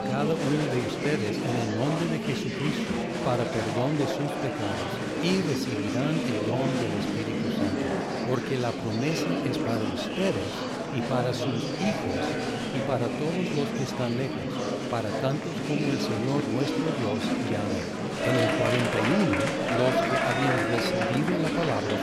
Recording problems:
murmuring crowd; very loud; throughout; 2 dB above the speech

